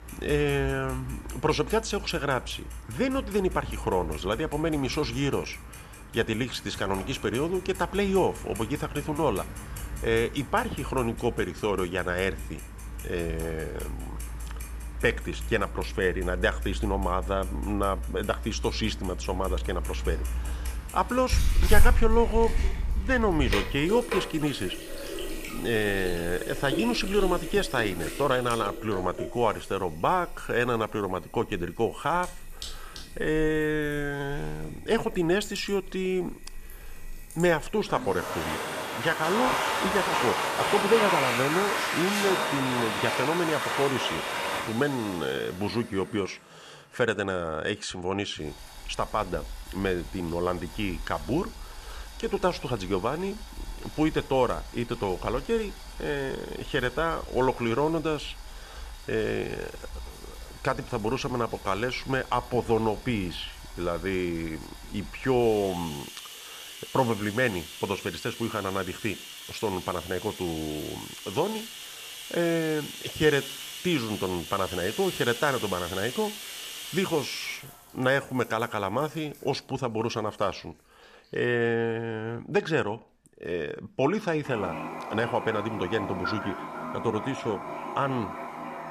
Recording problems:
household noises; loud; throughout; 6 dB below the speech

